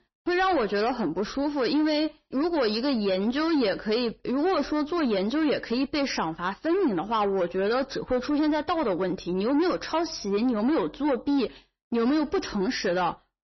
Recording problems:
distortion; slight; 10 dB below the speech
garbled, watery; slightly; nothing above 6 kHz

